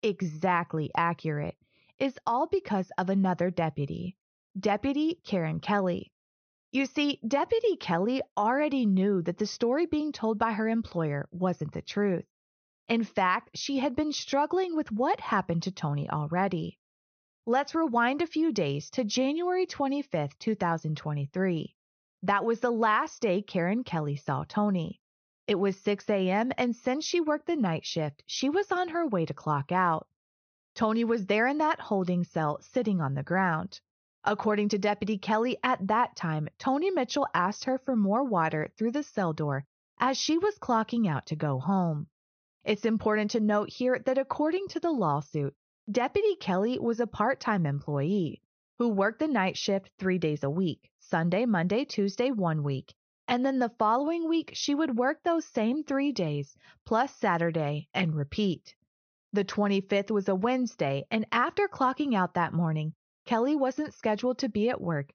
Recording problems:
high frequencies cut off; noticeable; nothing above 6 kHz

